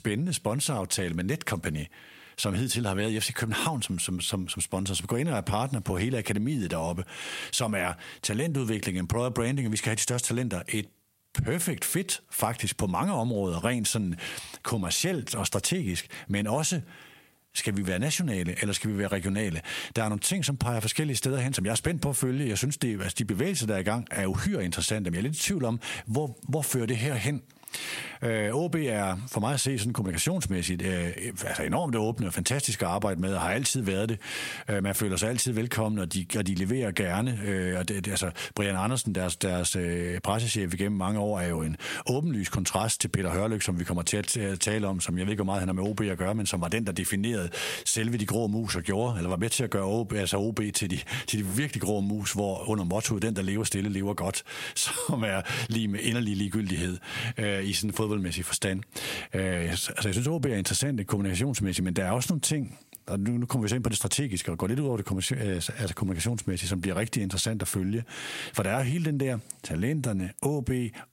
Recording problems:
squashed, flat; heavily

